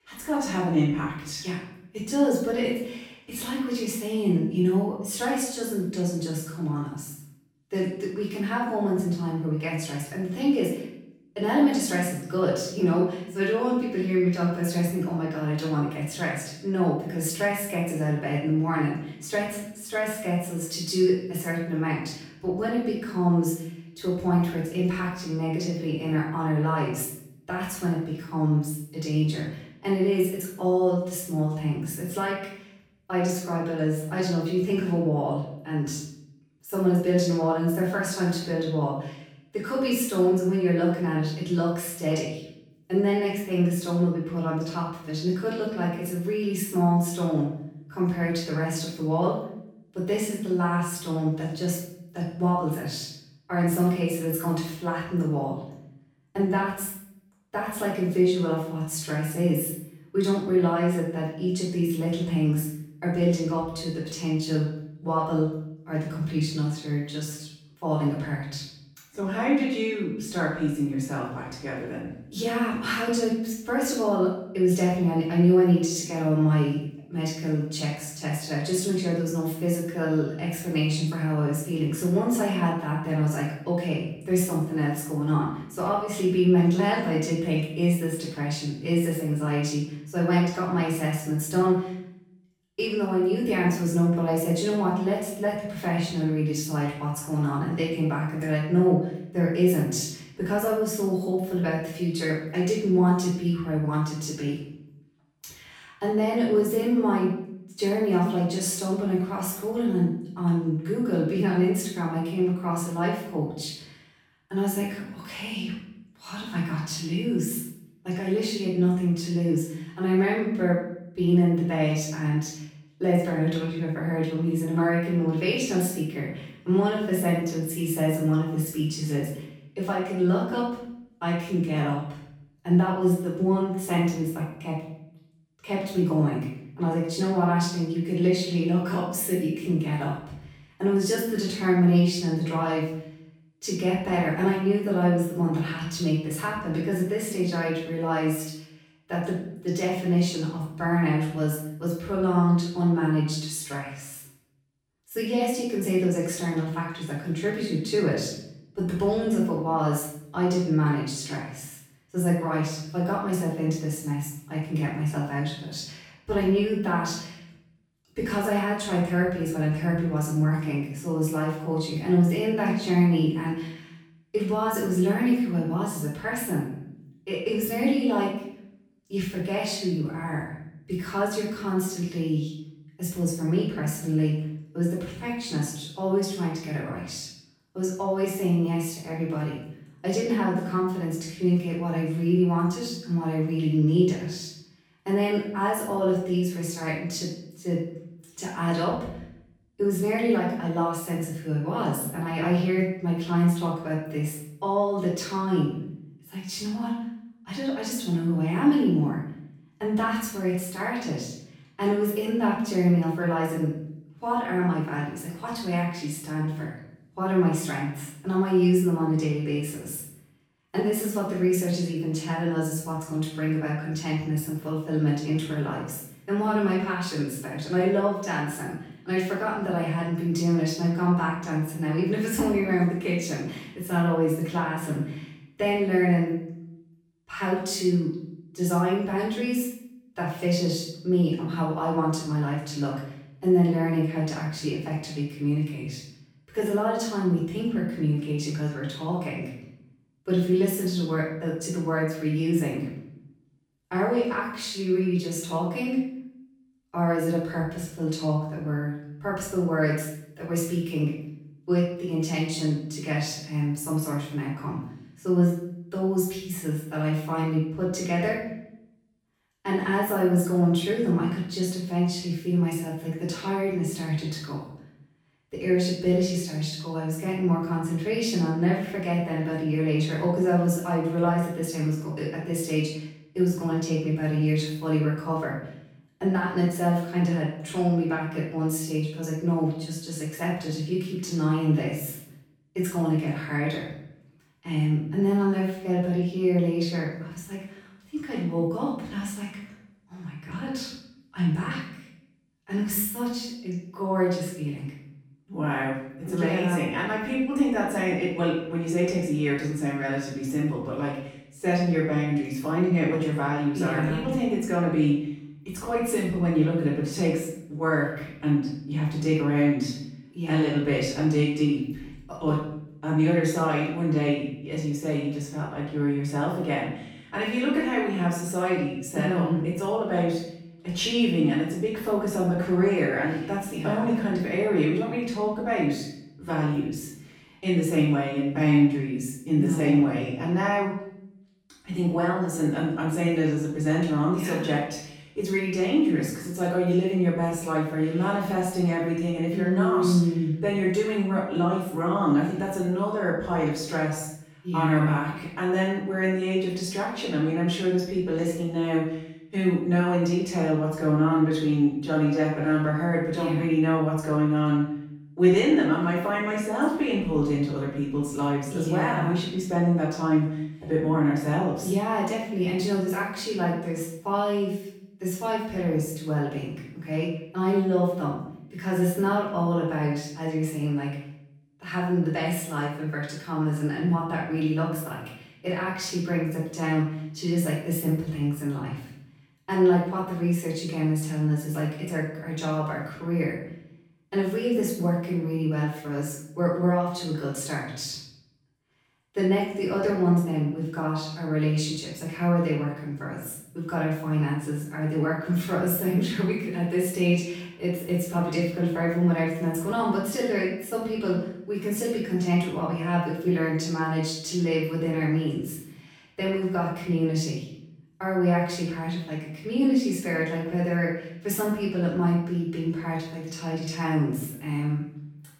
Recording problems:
off-mic speech; far
room echo; noticeable; dies away in 0.7 s

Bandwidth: 18.5 kHz